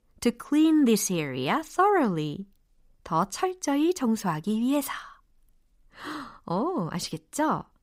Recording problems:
none

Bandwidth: 15.5 kHz